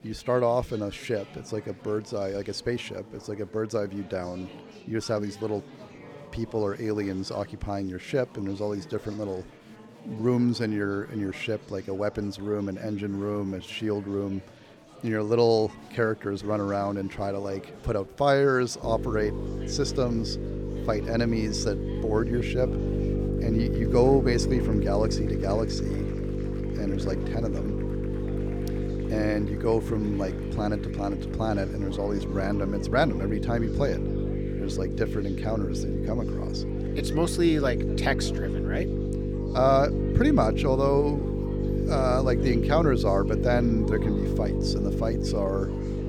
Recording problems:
electrical hum; loud; from 19 s on; 50 Hz, 6 dB below the speech
murmuring crowd; noticeable; throughout; 20 dB below the speech

